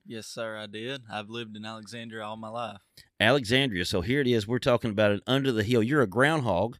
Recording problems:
none

